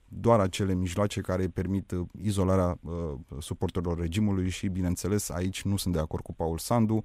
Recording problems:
none

